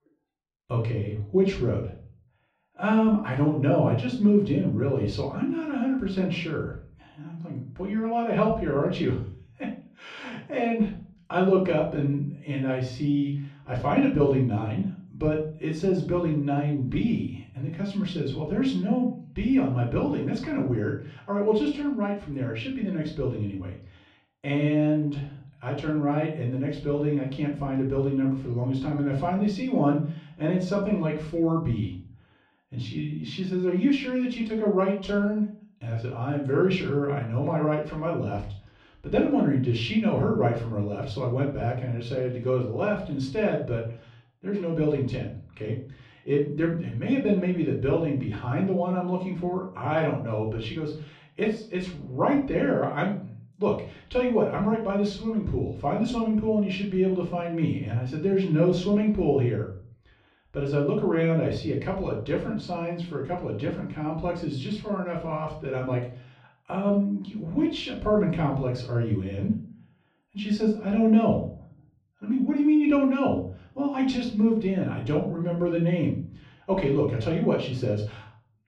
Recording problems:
off-mic speech; far
muffled; slightly; fading above 3.5 kHz
room echo; slight; dies away in 0.4 s

